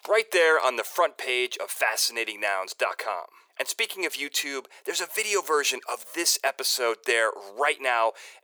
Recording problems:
thin; very; fading below 400 Hz

